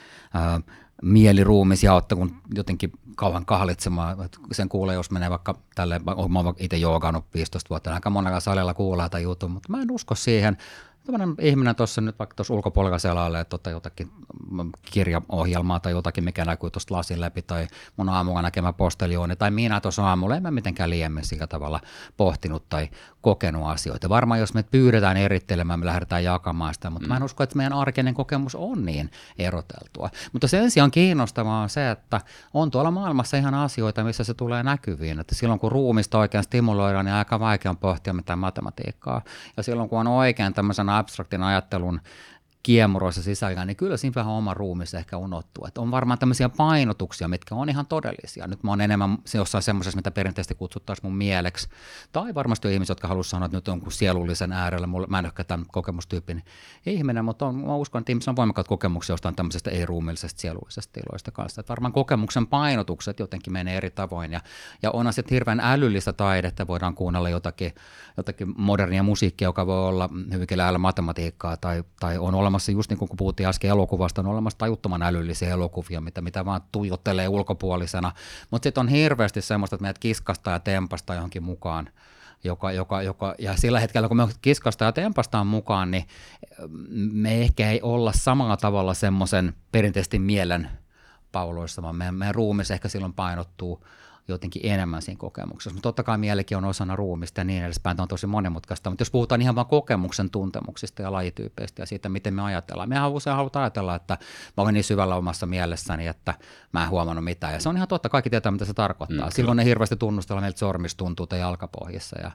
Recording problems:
none

